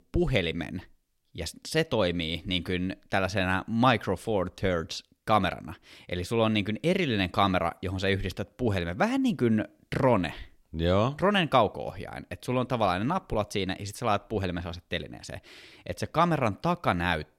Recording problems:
none

